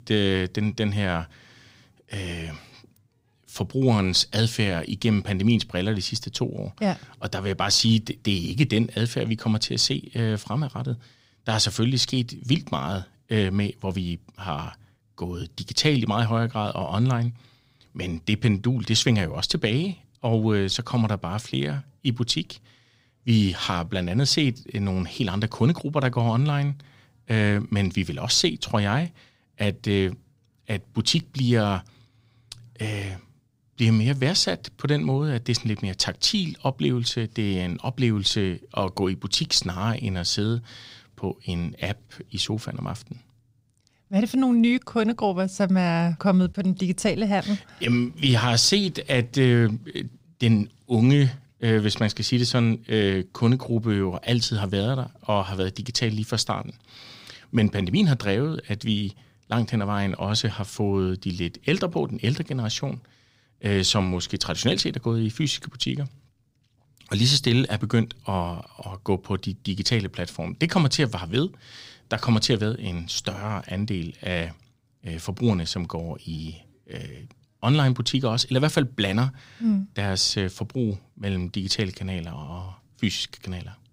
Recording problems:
none

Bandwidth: 15.5 kHz